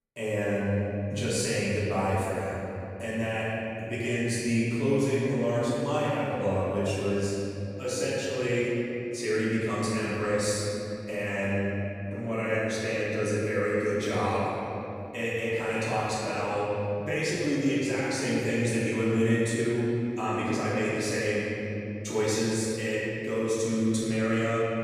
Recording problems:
room echo; strong; dies away in 3 s
off-mic speech; far

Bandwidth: 14.5 kHz